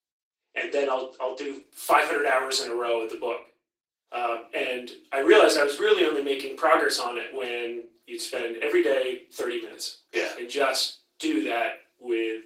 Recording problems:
off-mic speech; far
thin; somewhat; fading below 300 Hz
room echo; slight; dies away in 0.3 s
garbled, watery; slightly; nothing above 16 kHz

